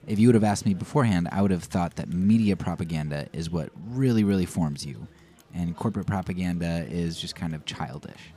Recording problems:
chatter from many people; faint; throughout; 25 dB below the speech

